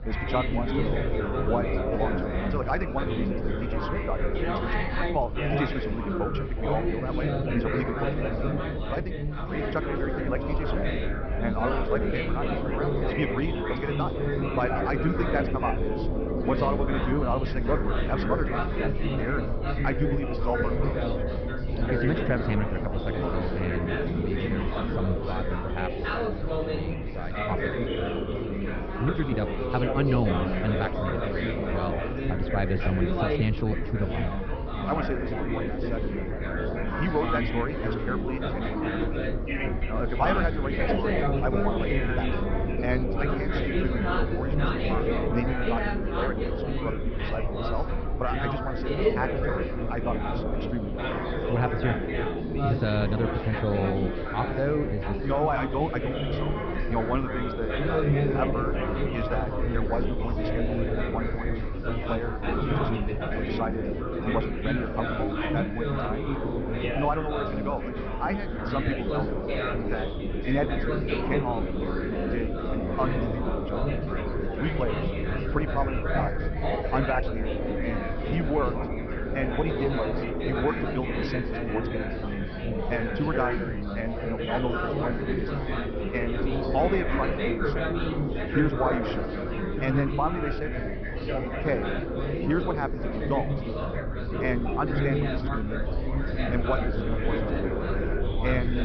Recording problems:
wrong speed, natural pitch; too fast; 1.5 times normal speed
high frequencies cut off; noticeable; nothing above 5.5 kHz
muffled; very slightly; fading above 3 kHz
chatter from many people; very loud; throughout; 2 dB above the speech
low rumble; noticeable; throughout; 20 dB below the speech

